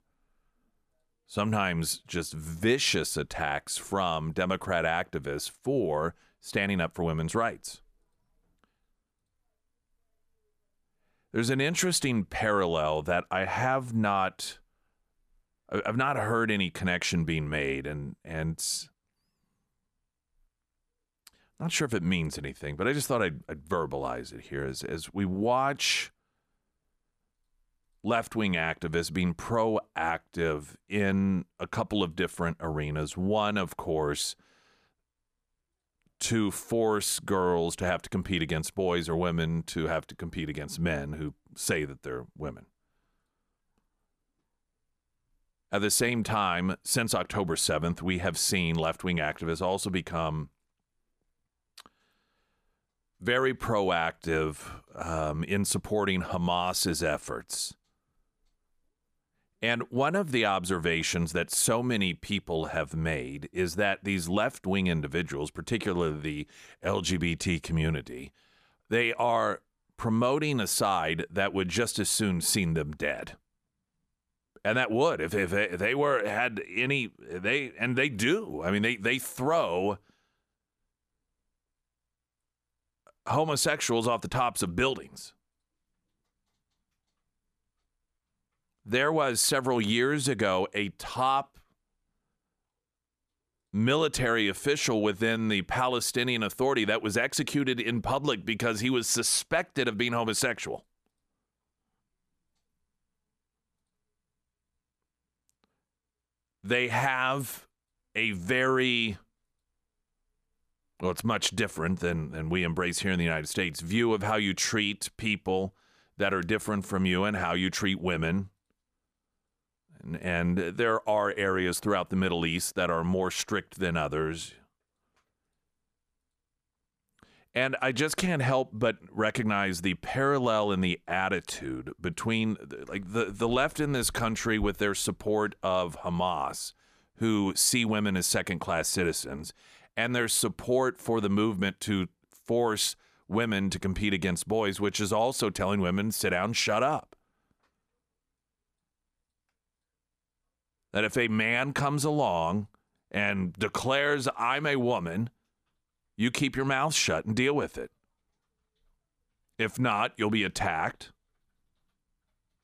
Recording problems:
none

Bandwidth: 14.5 kHz